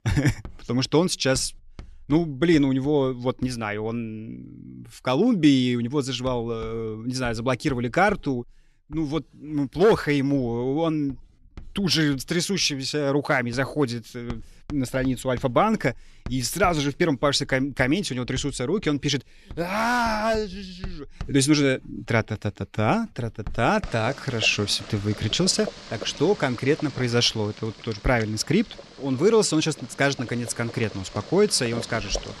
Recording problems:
household noises; noticeable; throughout; 20 dB below the speech

